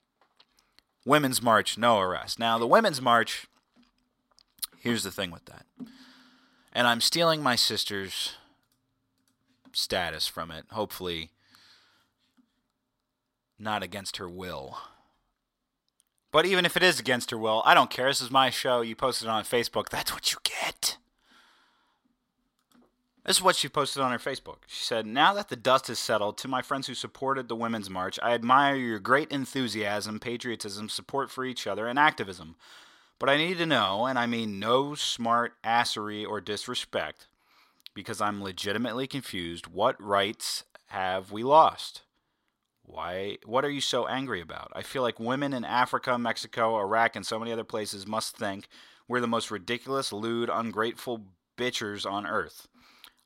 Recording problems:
thin; very slightly; fading below 500 Hz

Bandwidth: 16 kHz